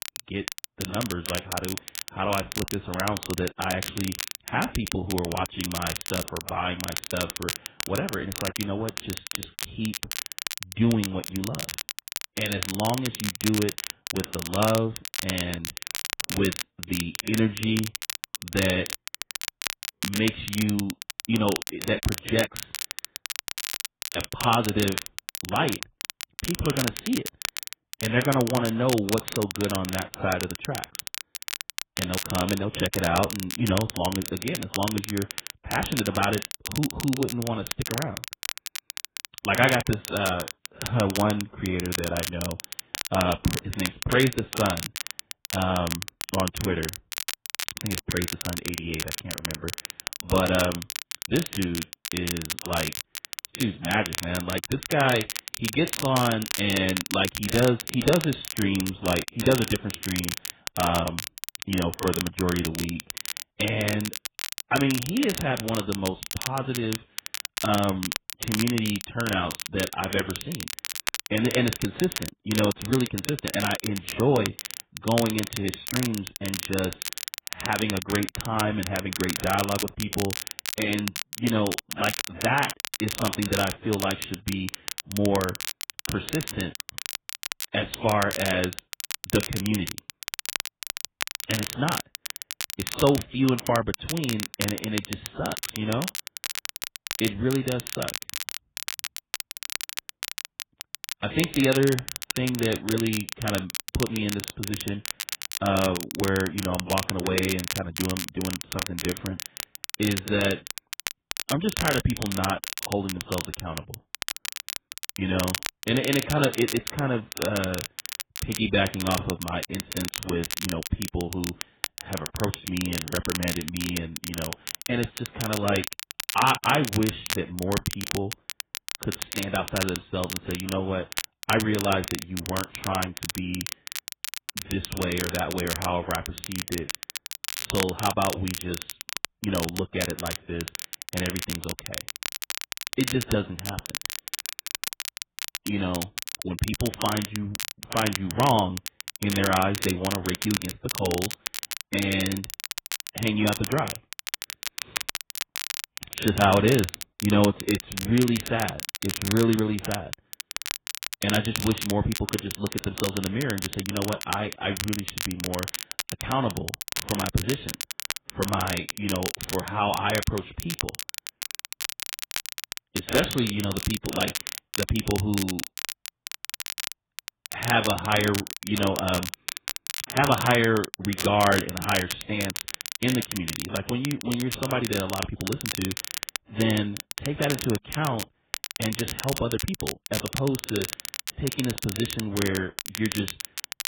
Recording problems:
garbled, watery; badly; nothing above 3.5 kHz
crackle, like an old record; loud; 5 dB below the speech

